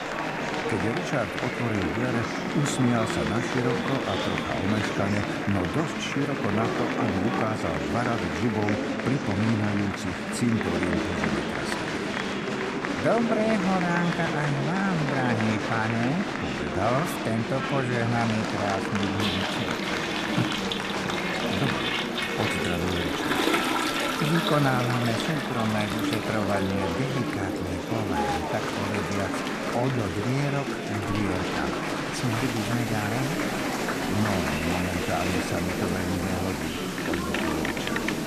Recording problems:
echo of what is said; noticeable; throughout; 220 ms later, 20 dB below the speech
murmuring crowd; very loud; throughout; as loud as the speech
household noises; loud; throughout; 4 dB below the speech
low rumble; faint; throughout; 25 dB below the speech

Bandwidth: 14.5 kHz